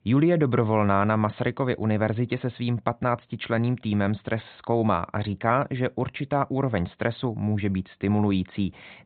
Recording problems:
high frequencies cut off; severe; nothing above 4 kHz

